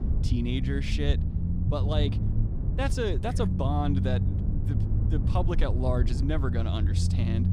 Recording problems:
low rumble; loud; throughout; 7 dB below the speech

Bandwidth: 15.5 kHz